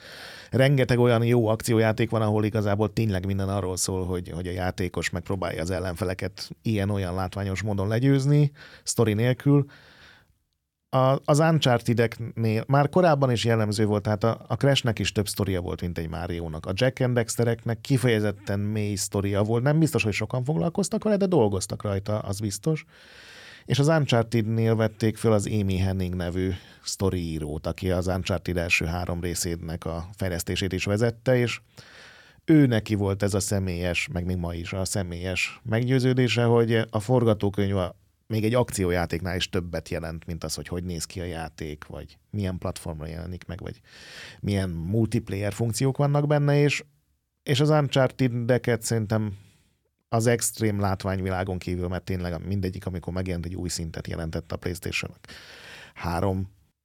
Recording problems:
none

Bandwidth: 17.5 kHz